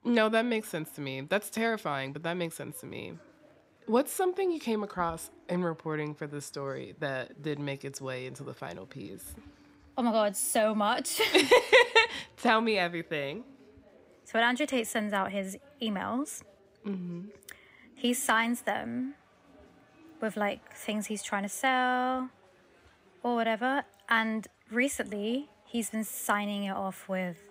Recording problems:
chatter from many people; faint; throughout; 30 dB below the speech

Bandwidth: 15.5 kHz